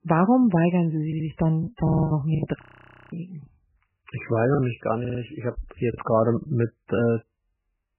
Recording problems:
garbled, watery; badly; nothing above 3 kHz
audio stuttering; at 1 s, at 2 s and at 5 s
choppy; very; from 1.5 to 4.5 s and at 6 s; 10% of the speech affected
audio freezing; at 2.5 s for 0.5 s

